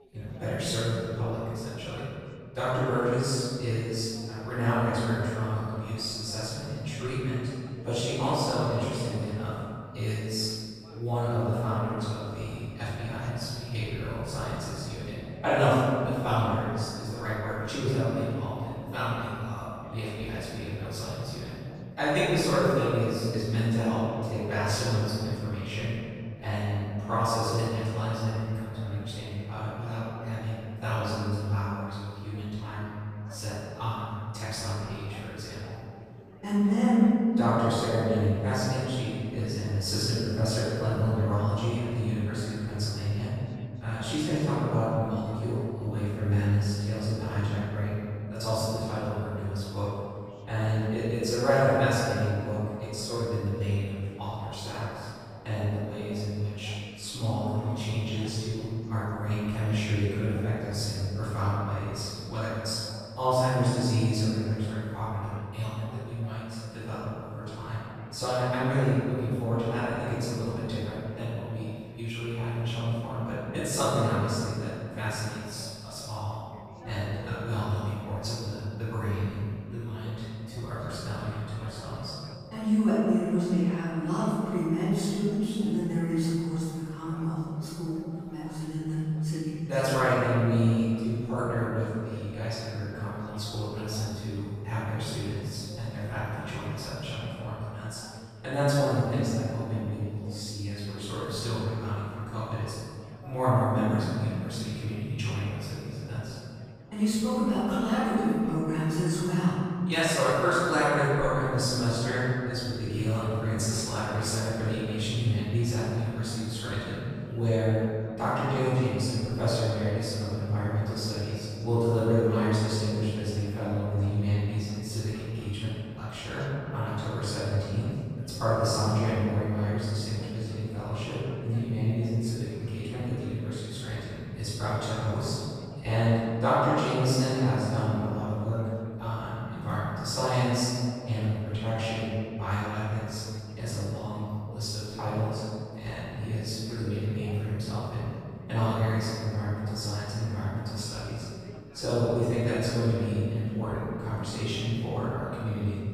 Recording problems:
room echo; strong; dies away in 2.1 s
off-mic speech; far
background chatter; faint; throughout; 3 voices, 20 dB below the speech

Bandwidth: 15 kHz